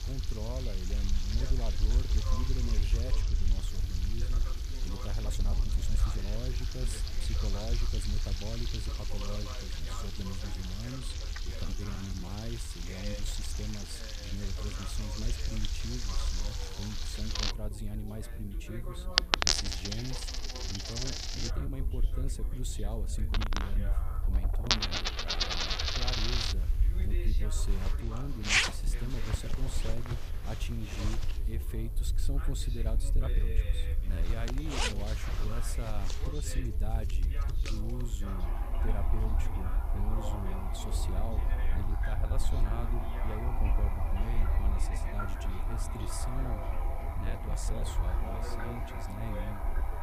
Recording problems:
household noises; very loud; throughout; 4 dB above the speech
background chatter; loud; throughout; 3 voices, 9 dB below the speech
electrical hum; noticeable; throughout; 60 Hz, 15 dB below the speech
low rumble; noticeable; throughout; 10 dB below the speech
uneven, jittery; strongly; from 5 to 48 s

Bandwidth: 15 kHz